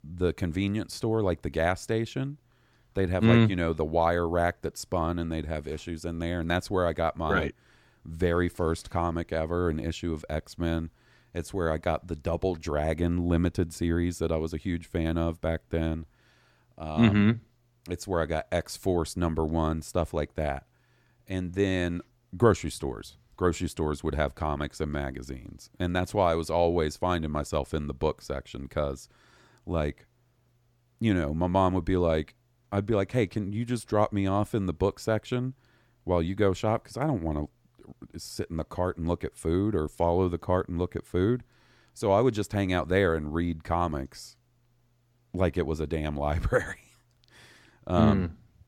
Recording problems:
none

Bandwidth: 17.5 kHz